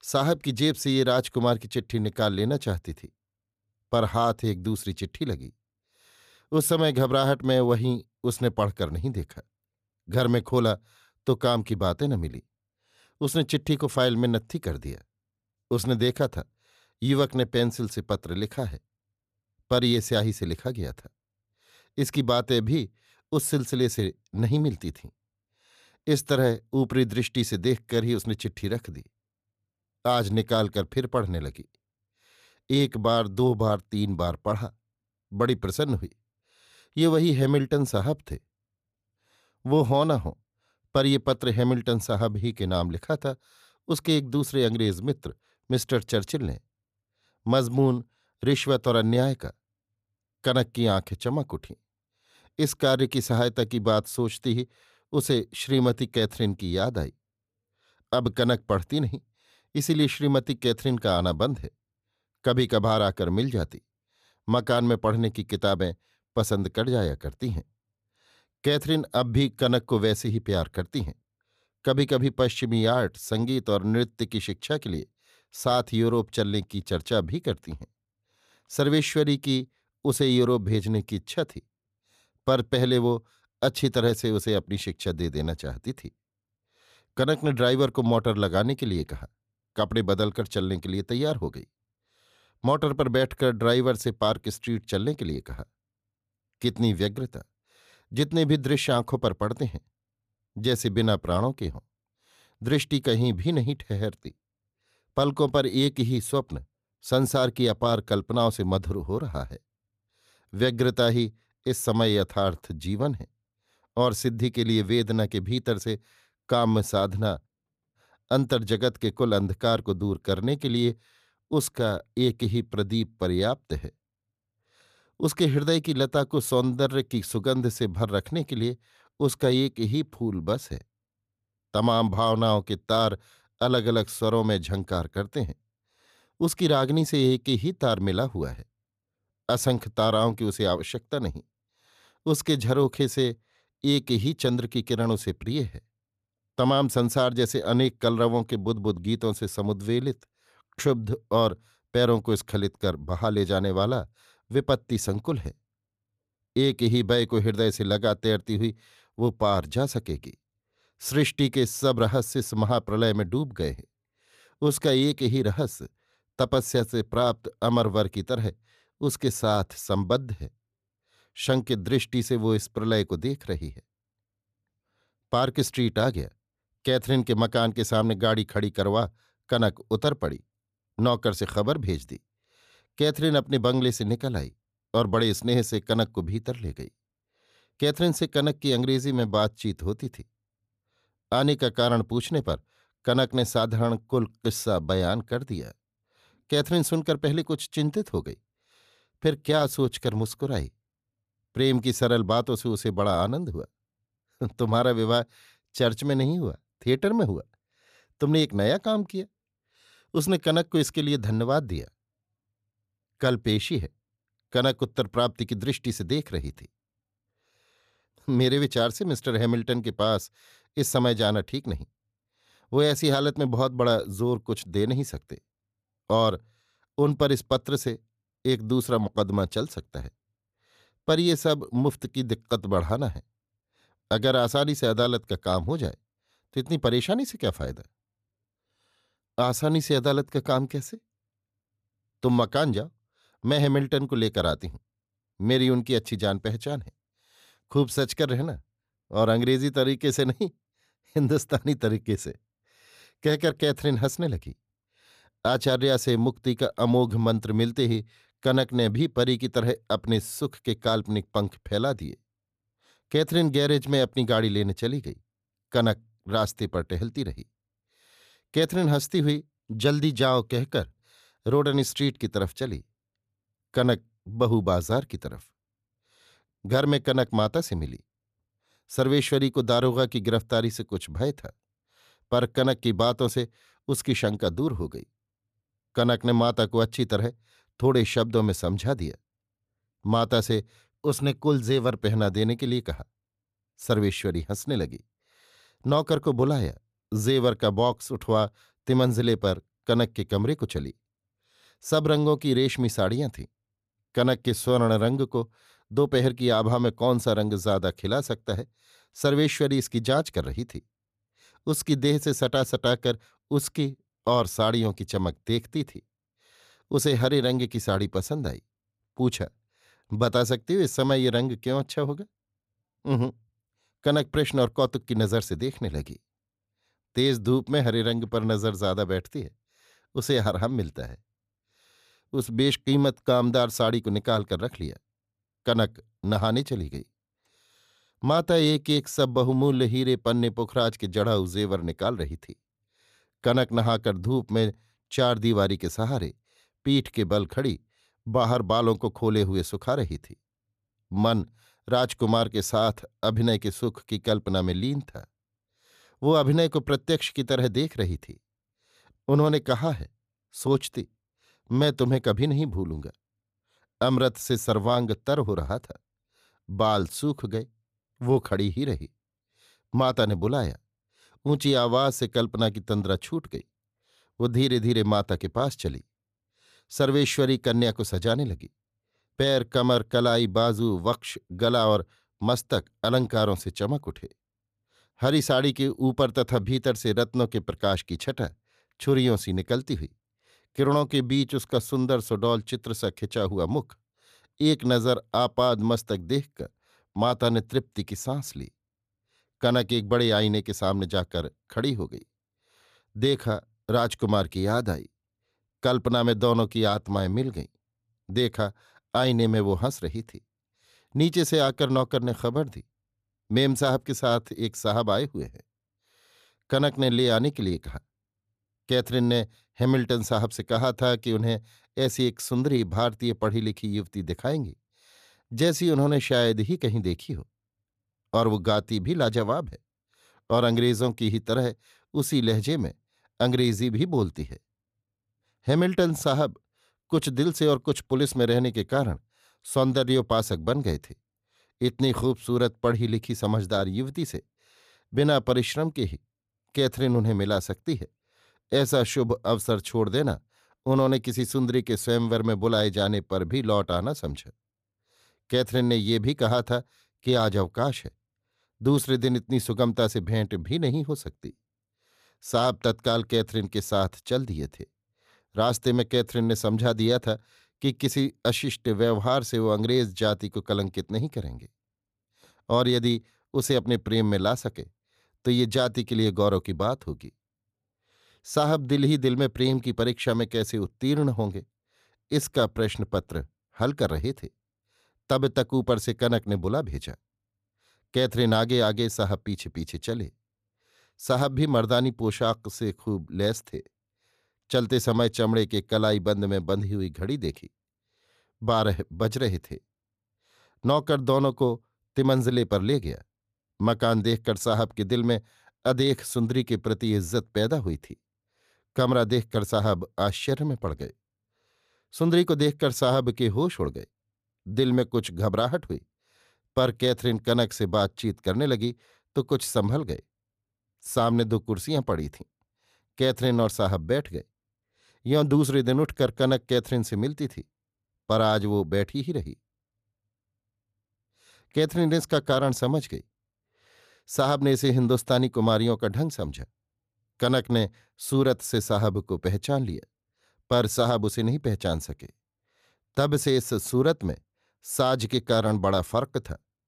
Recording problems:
none

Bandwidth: 14.5 kHz